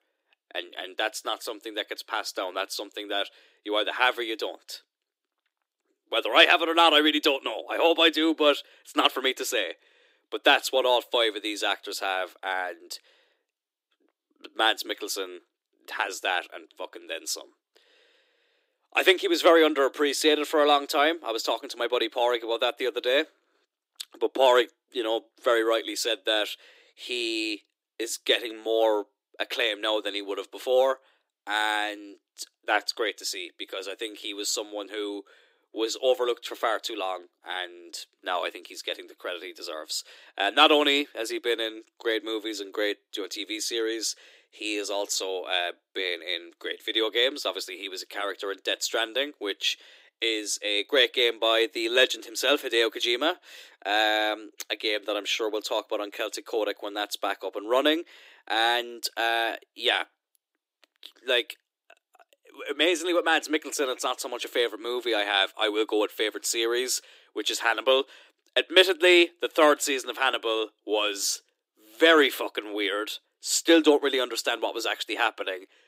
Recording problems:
thin; somewhat; fading below 300 Hz

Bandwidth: 15.5 kHz